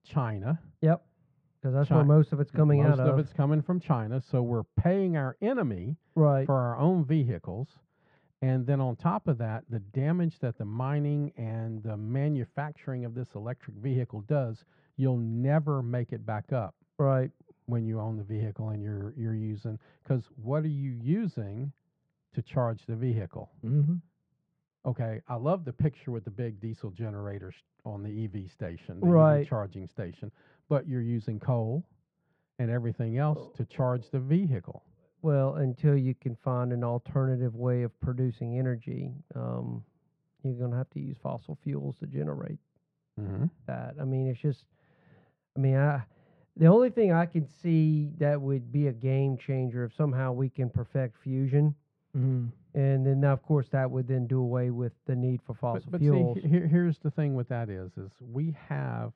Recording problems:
muffled; very; fading above 1.5 kHz

